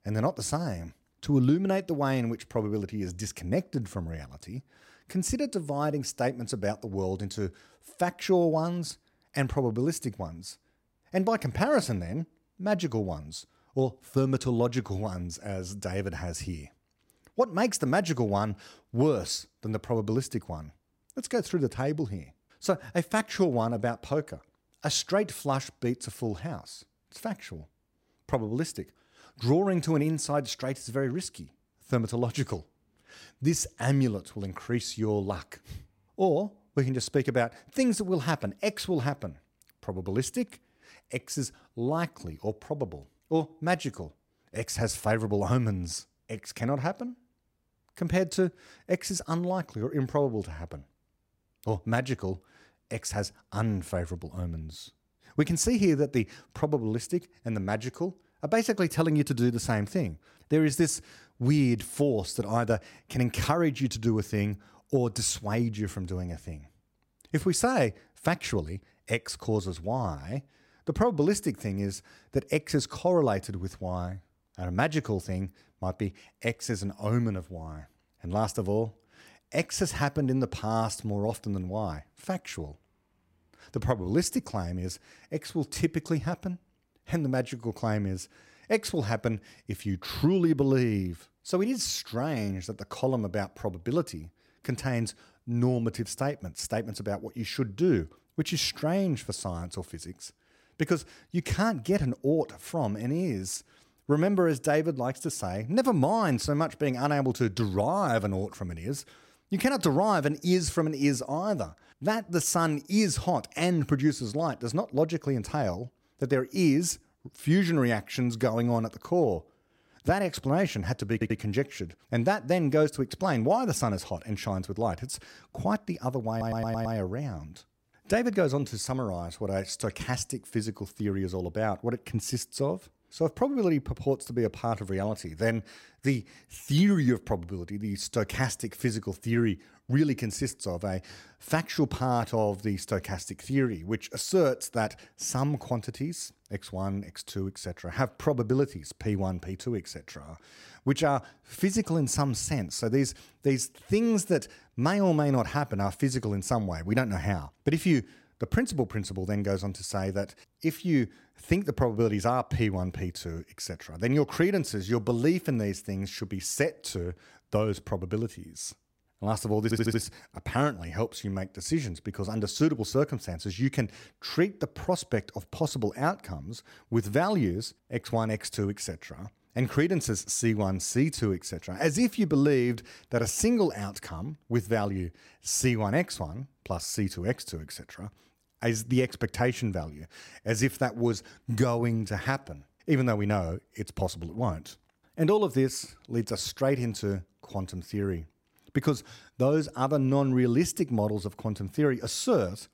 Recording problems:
audio stuttering; at 2:01, at 2:06 and at 2:50

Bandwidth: 16 kHz